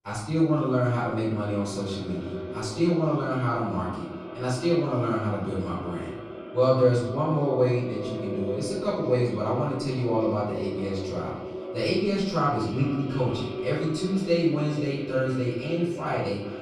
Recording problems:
echo of what is said; strong; throughout; 410 ms later, 10 dB below the speech
off-mic speech; far
room echo; noticeable; dies away in 0.7 s

